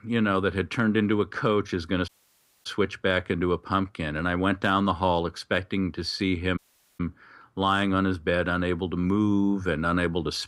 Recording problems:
audio cutting out; at 2 s for 0.5 s and at 6.5 s

